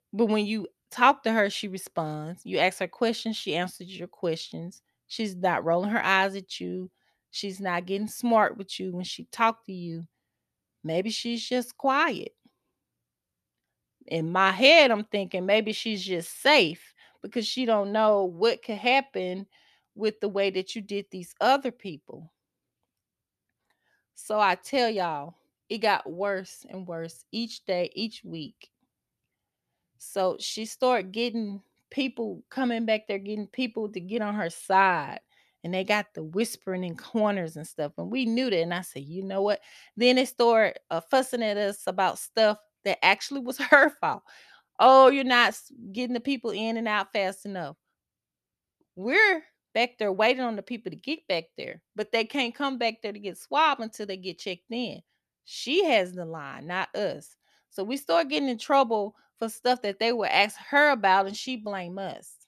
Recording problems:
none

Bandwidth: 14 kHz